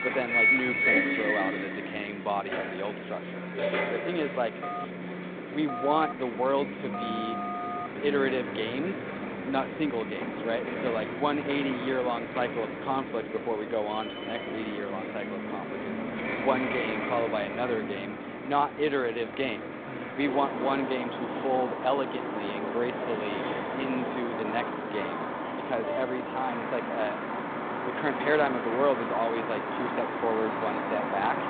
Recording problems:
phone-call audio; nothing above 3.5 kHz
traffic noise; loud; throughout; 1 dB below the speech
phone ringing; noticeable; from 4.5 to 8 s; peak 3 dB below the speech

